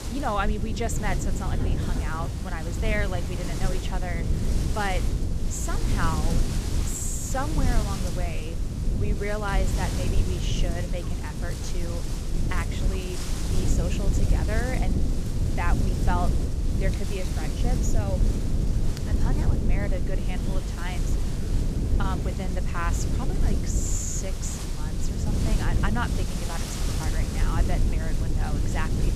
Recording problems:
wind noise on the microphone; heavy; 7 dB below the speech
low rumble; loud; throughout; 6 dB below the speech
rain or running water; noticeable; throughout; 10 dB below the speech

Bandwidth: 14.5 kHz